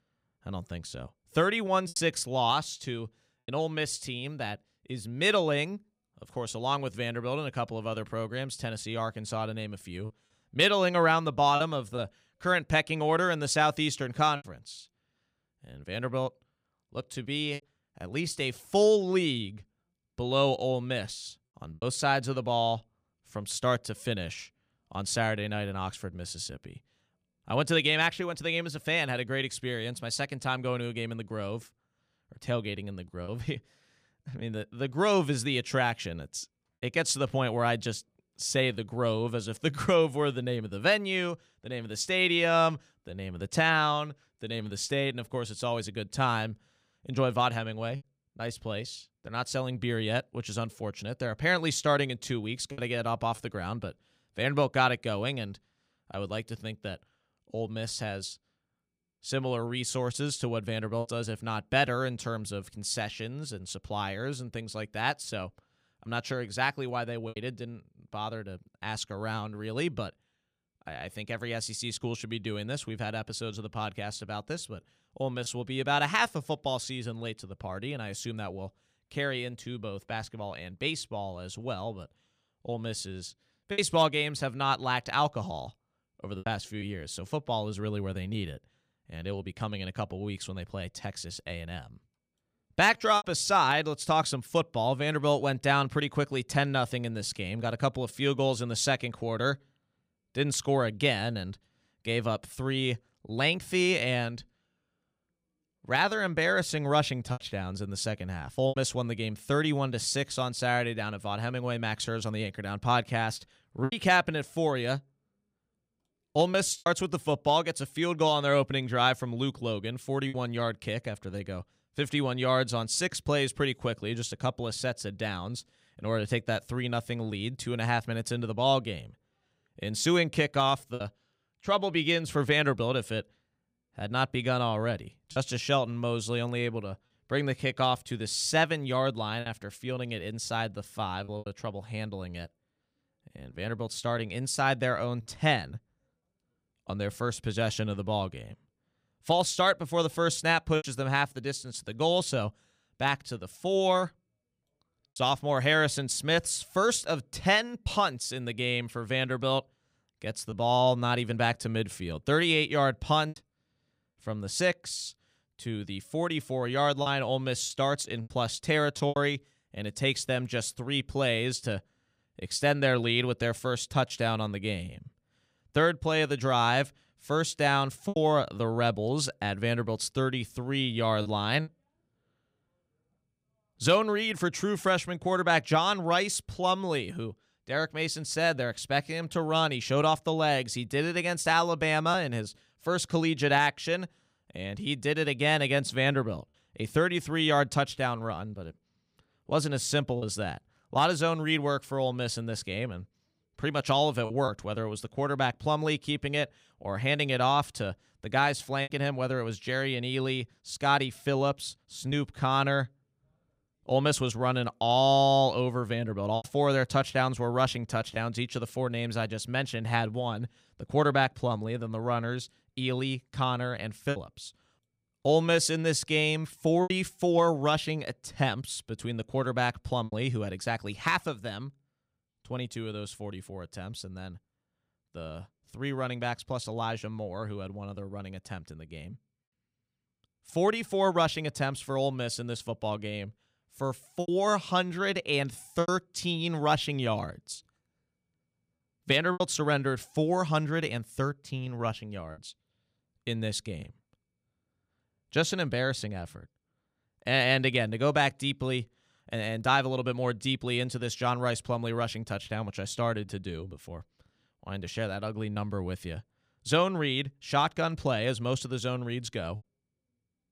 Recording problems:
choppy; occasionally; 2% of the speech affected

